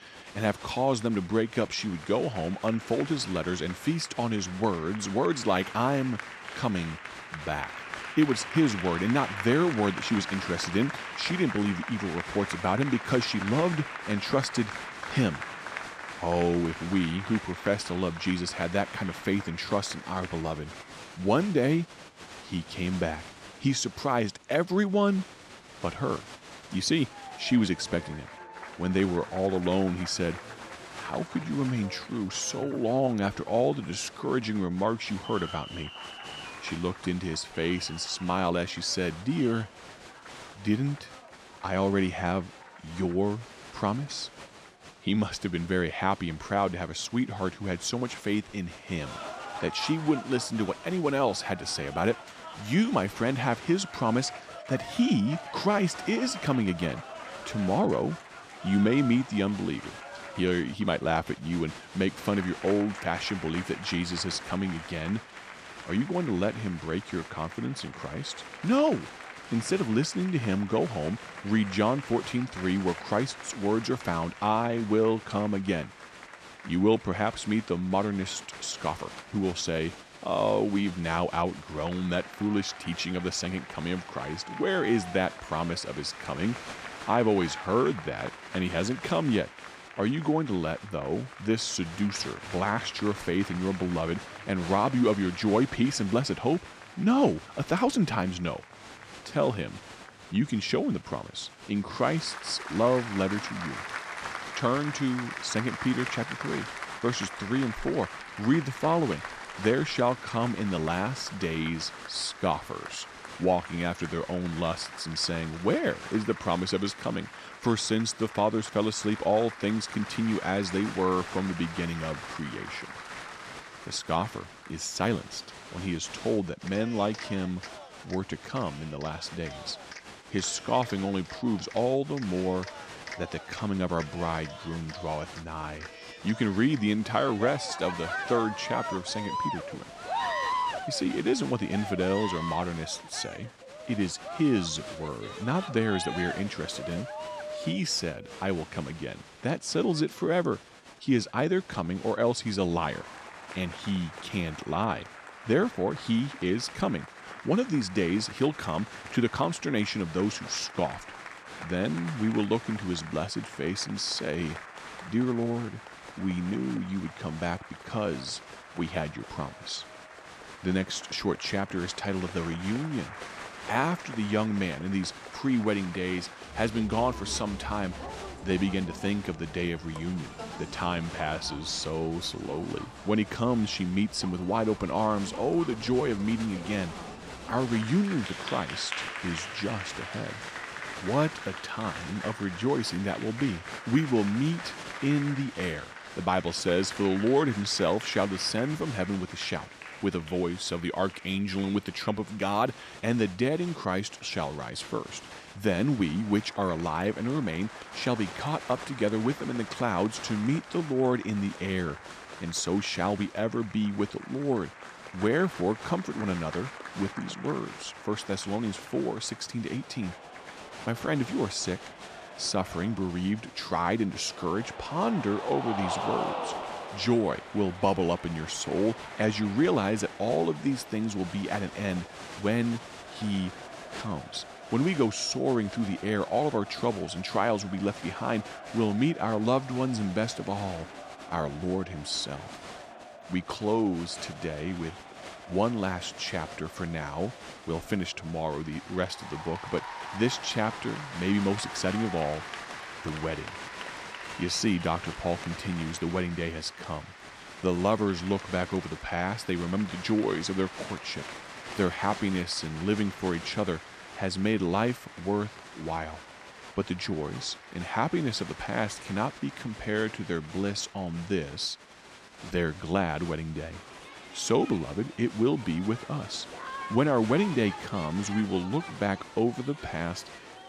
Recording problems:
crowd noise; noticeable; throughout; 10 dB below the speech

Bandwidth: 14 kHz